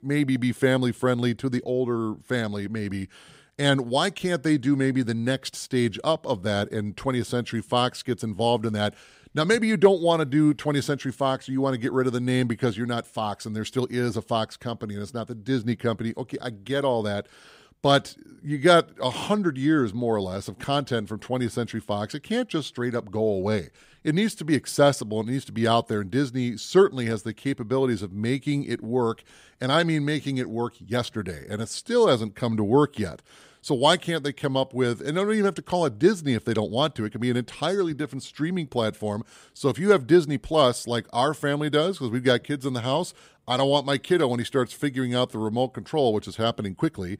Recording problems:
none

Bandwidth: 15.5 kHz